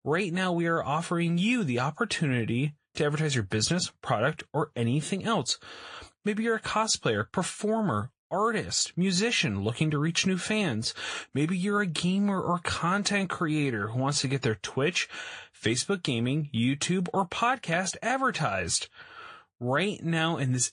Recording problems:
garbled, watery; slightly; nothing above 8.5 kHz

